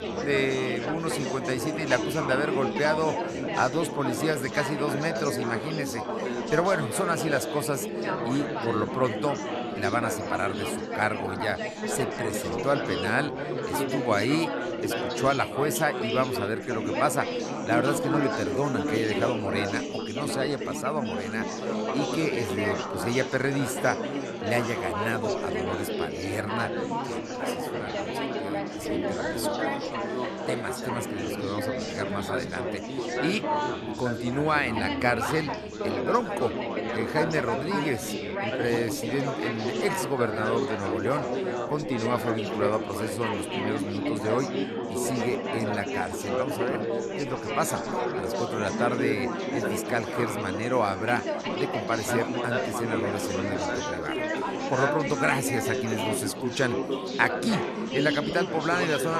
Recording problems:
chatter from many people; loud; throughout; 1 dB below the speech
abrupt cut into speech; at the end

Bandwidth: 13.5 kHz